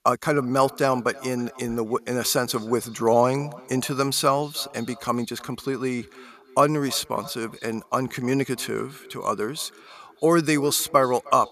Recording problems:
echo of what is said; faint; throughout; 310 ms later, 20 dB below the speech

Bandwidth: 14.5 kHz